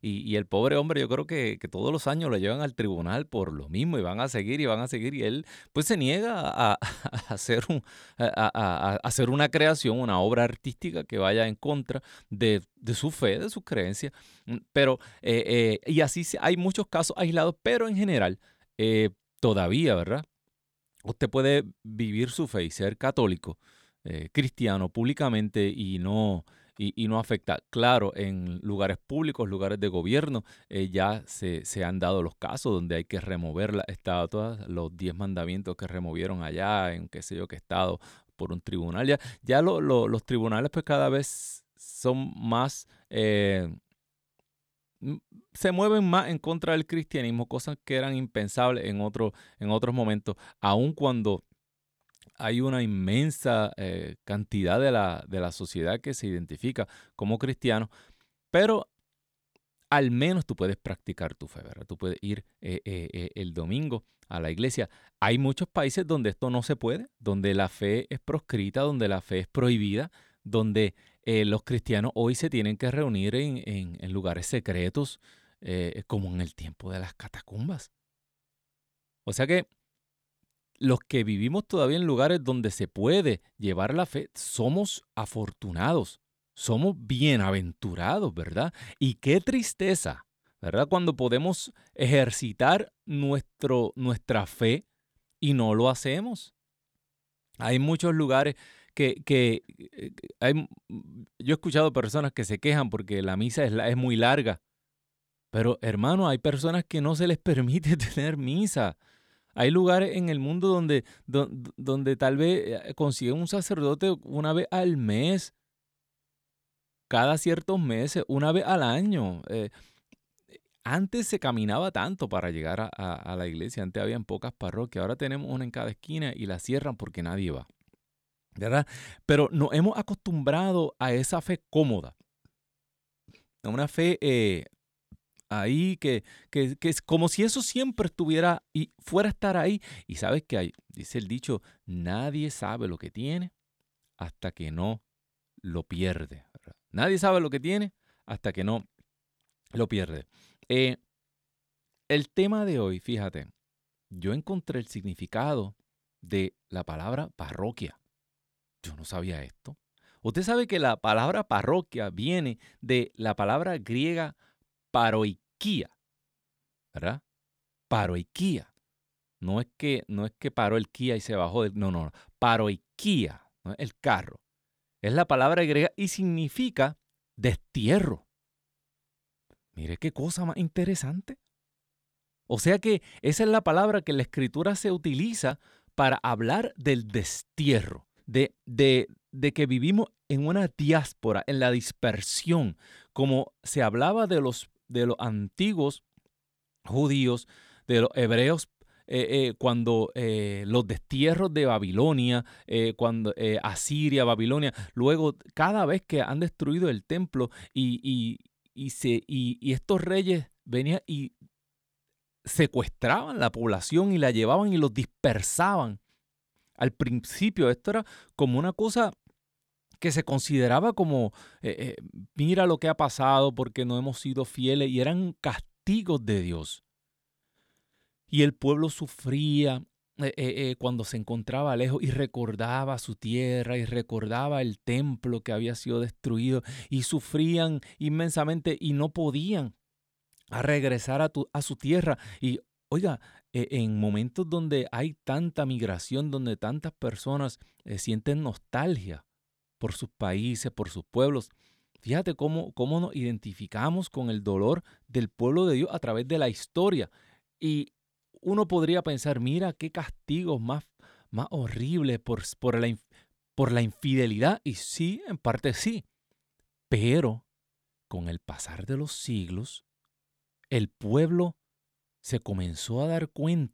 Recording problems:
none

